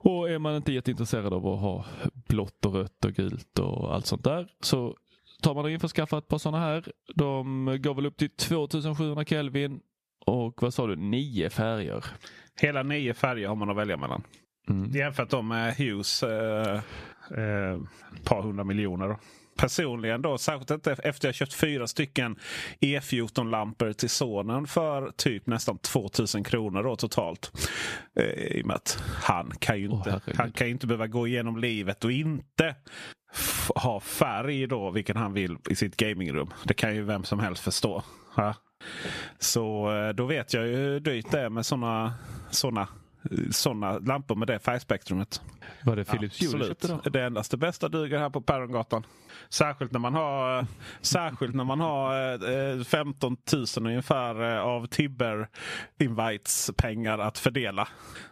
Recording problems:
squashed, flat; somewhat

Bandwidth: 14.5 kHz